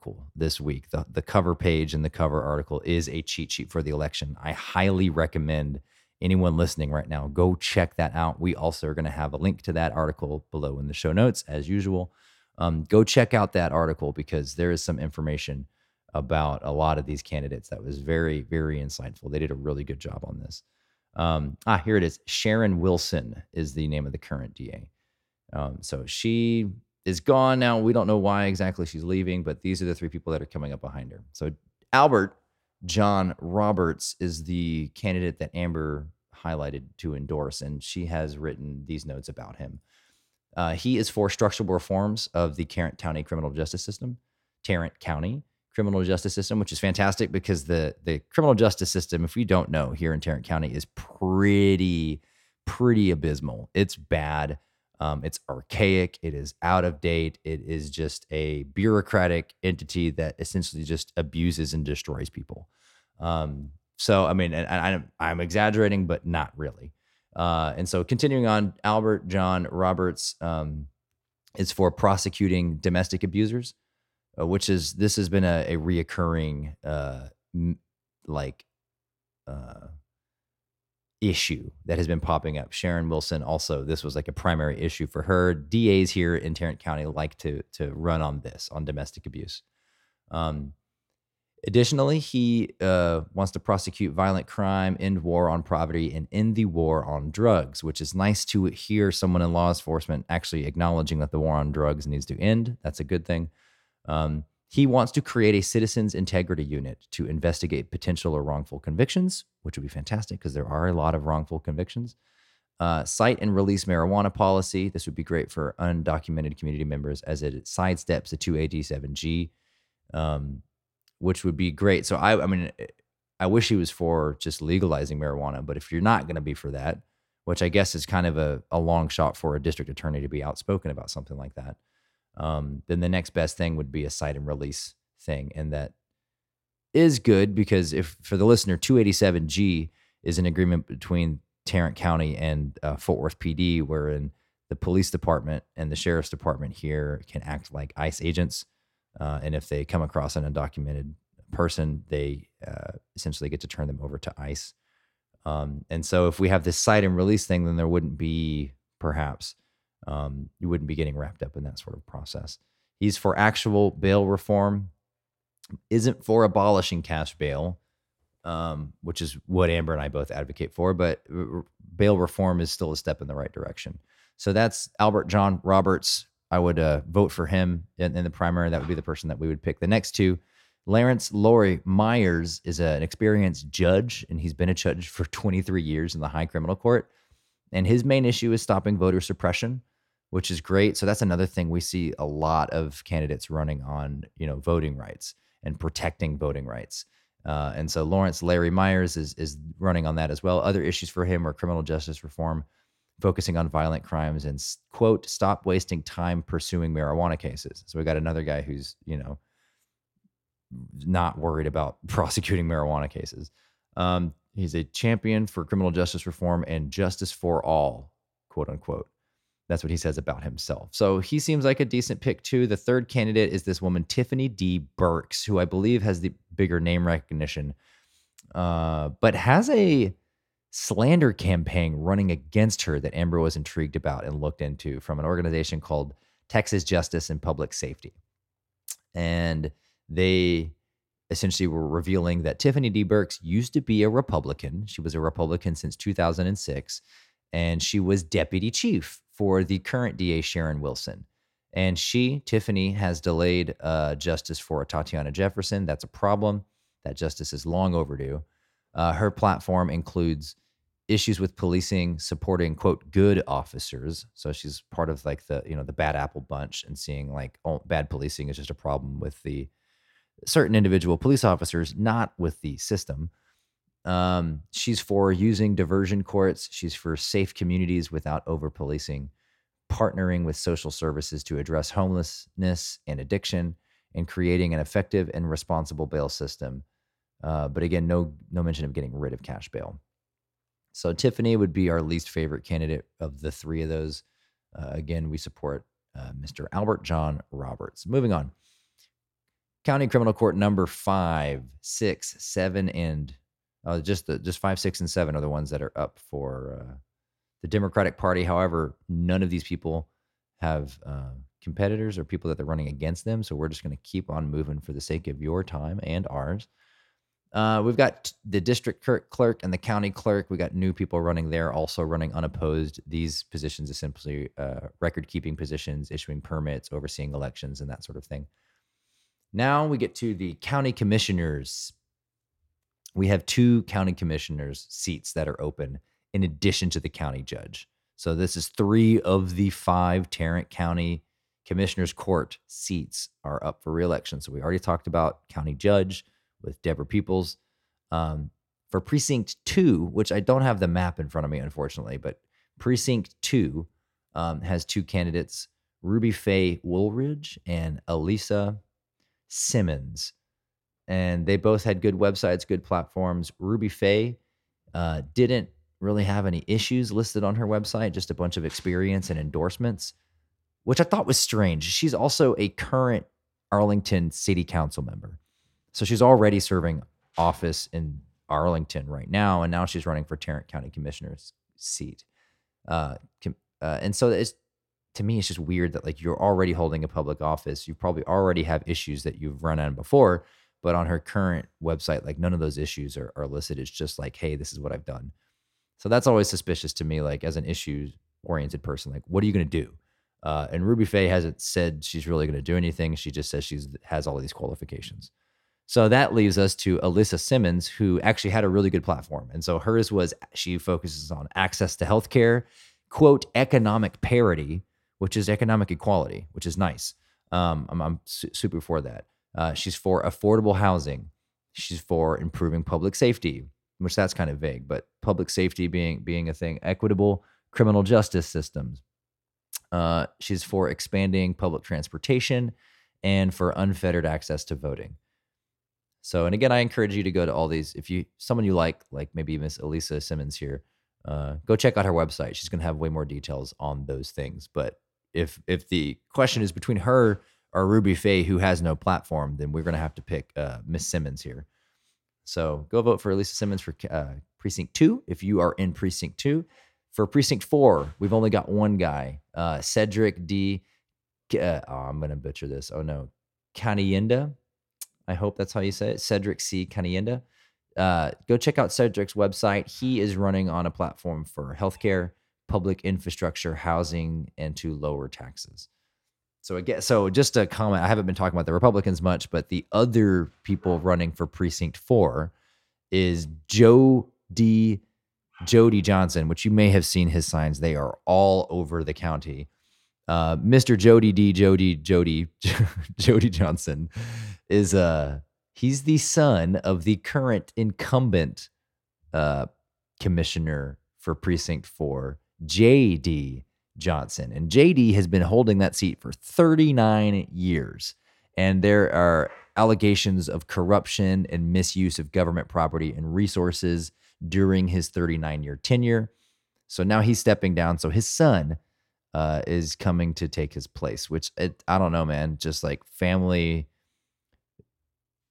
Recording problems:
none

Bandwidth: 16.5 kHz